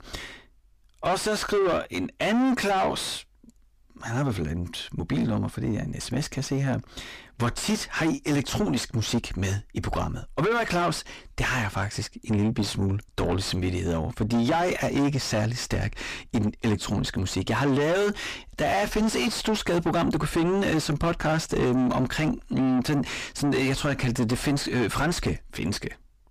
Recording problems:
distortion; heavy; 4 dB below the speech

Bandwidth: 15 kHz